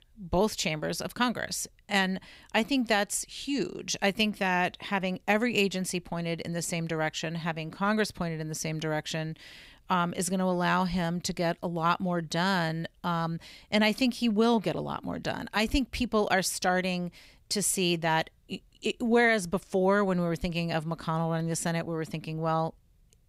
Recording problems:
none

